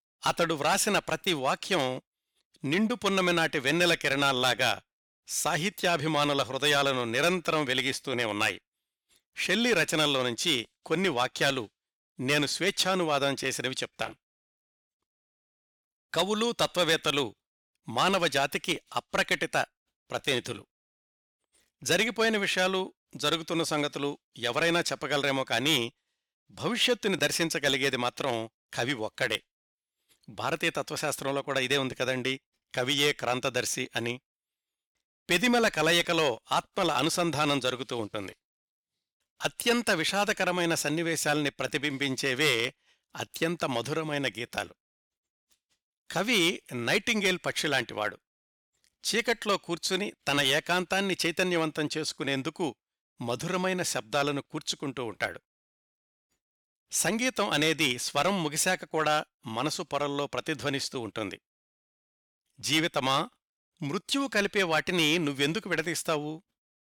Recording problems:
none

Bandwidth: 18.5 kHz